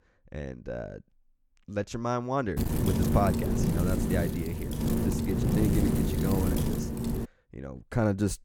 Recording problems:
wind noise on the microphone; heavy; from 2.5 to 7.5 s; 1 dB below the speech

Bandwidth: 17 kHz